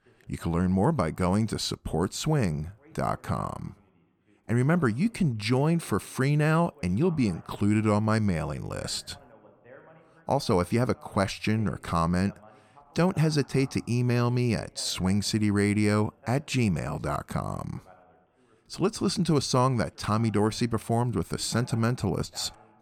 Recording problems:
voice in the background; faint; throughout; 30 dB below the speech

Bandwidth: 17.5 kHz